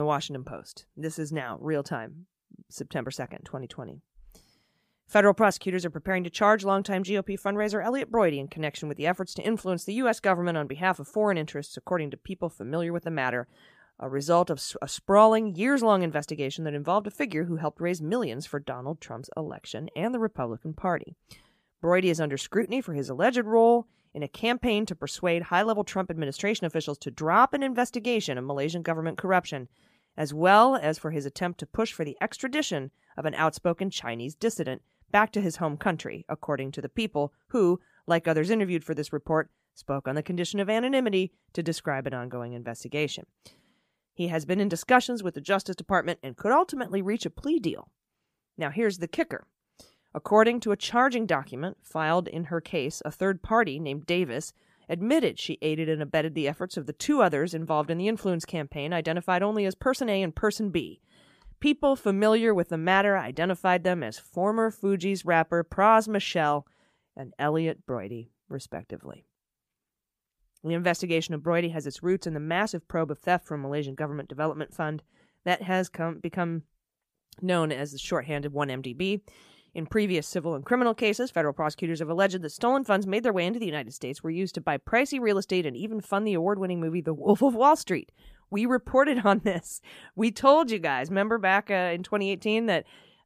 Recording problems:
abrupt cut into speech; at the start

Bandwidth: 15 kHz